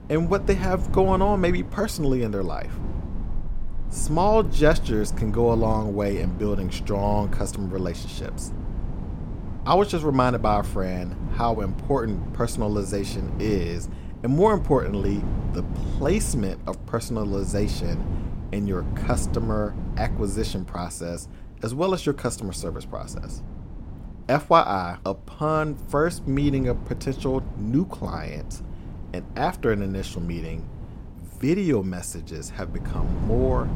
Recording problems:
traffic noise; noticeable; throughout; 15 dB below the speech
wind noise on the microphone; occasional gusts; 15 dB below the speech

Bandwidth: 16 kHz